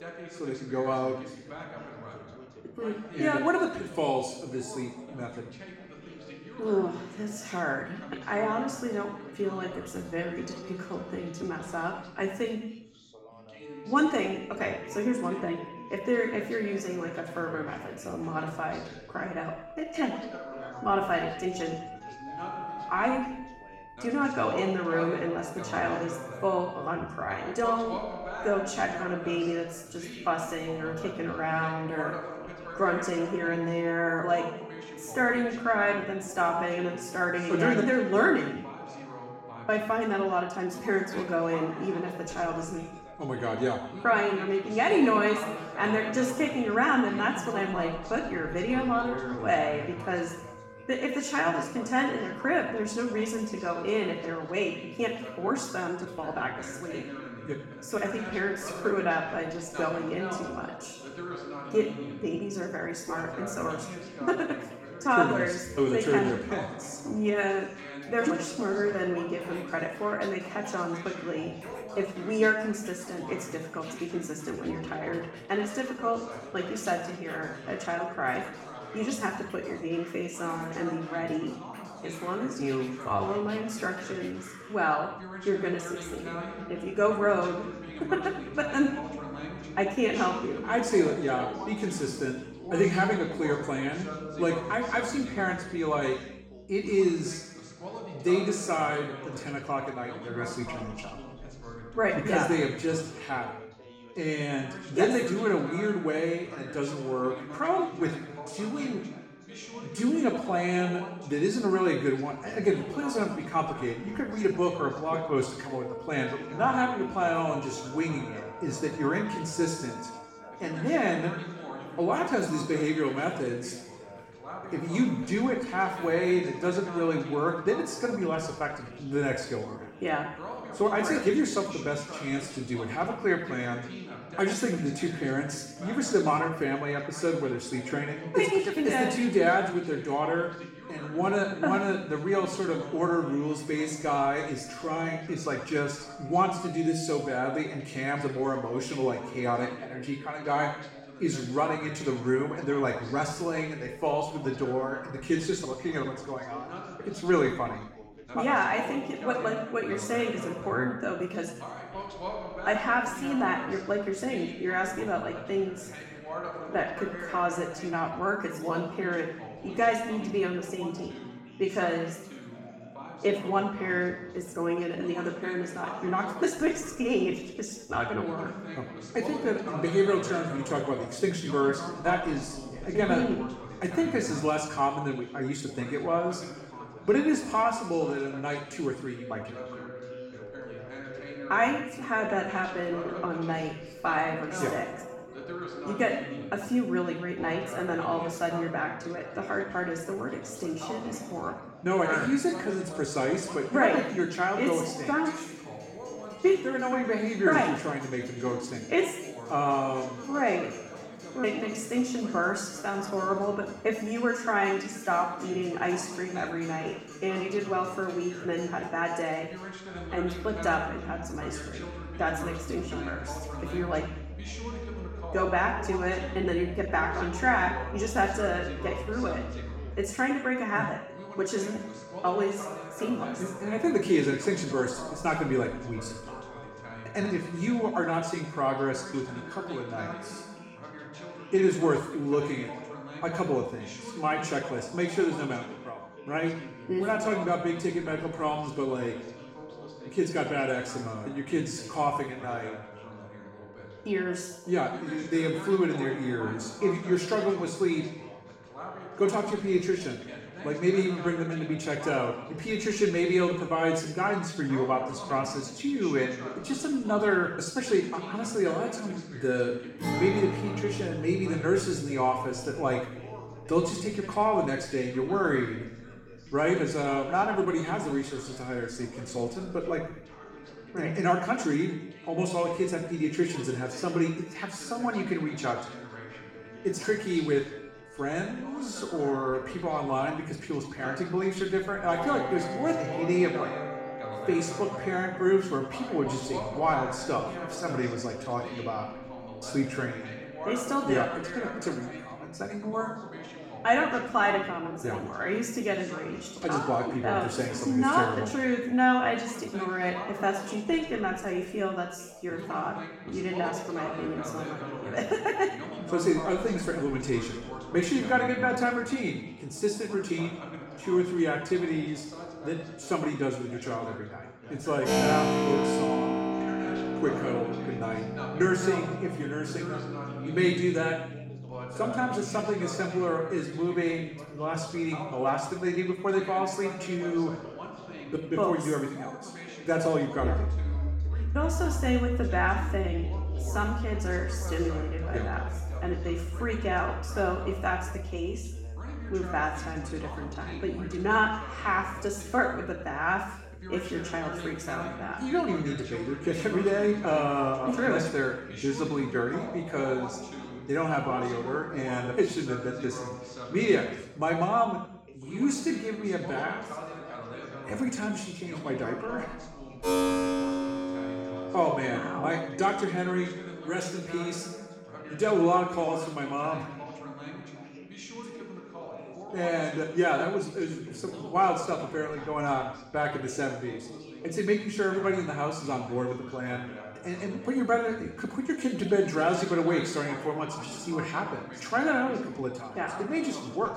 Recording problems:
off-mic speech; far
room echo; noticeable; dies away in 0.8 s
background music; noticeable; throughout; 10 dB below the speech
background chatter; noticeable; throughout; 2 voices, 15 dB below the speech

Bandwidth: 16.5 kHz